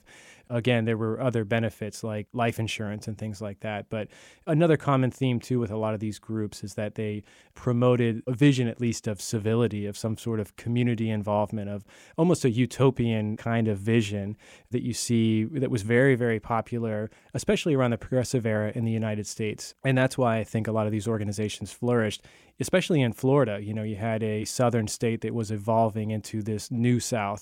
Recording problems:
none

